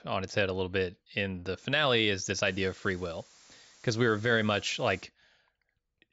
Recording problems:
high frequencies cut off; noticeable; nothing above 7.5 kHz
hiss; faint; from 2.5 to 5 s; 25 dB below the speech

